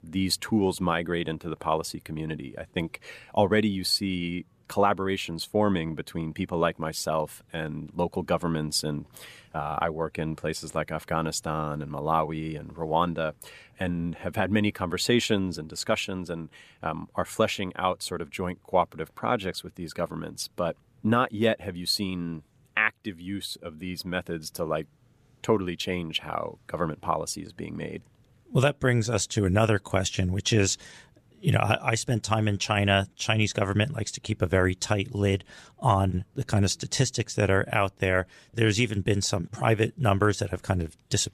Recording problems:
none

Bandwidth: 14.5 kHz